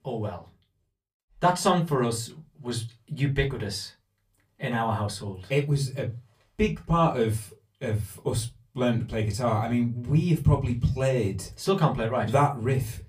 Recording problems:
off-mic speech; far
room echo; very slight; dies away in 0.2 s

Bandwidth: 15 kHz